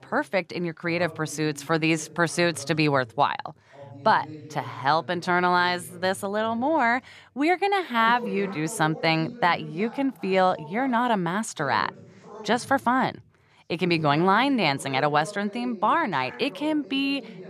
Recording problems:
background chatter; noticeable; throughout; 2 voices, 20 dB below the speech

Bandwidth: 14 kHz